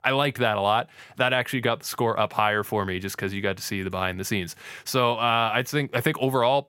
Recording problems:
none

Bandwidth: 16.5 kHz